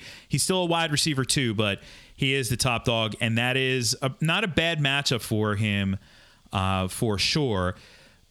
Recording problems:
squashed, flat; somewhat

